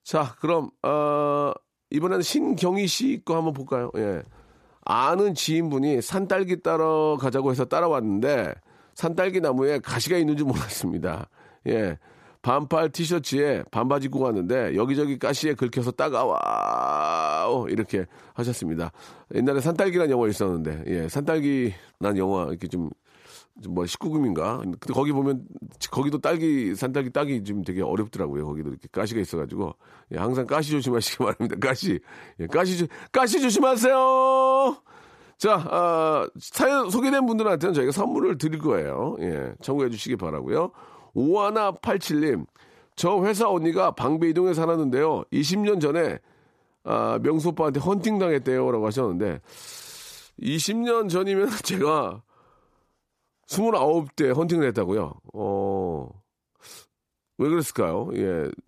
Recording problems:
none

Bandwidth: 14.5 kHz